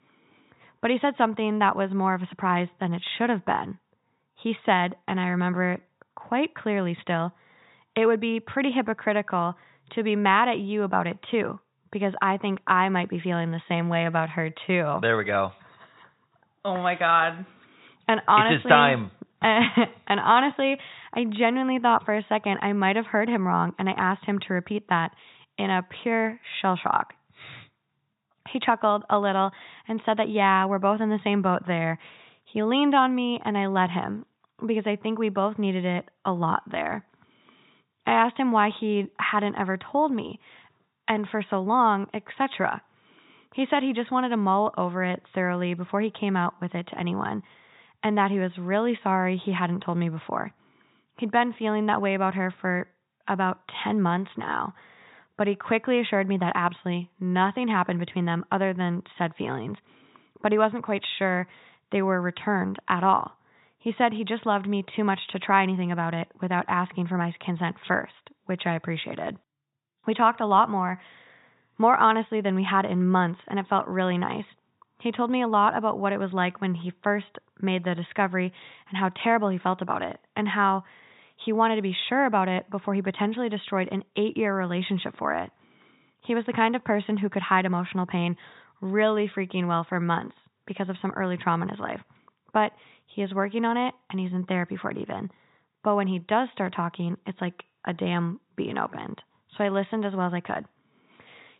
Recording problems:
high frequencies cut off; severe; nothing above 4 kHz

